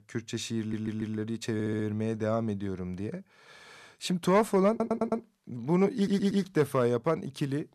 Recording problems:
audio stuttering; 4 times, first at 0.5 s

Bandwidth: 13.5 kHz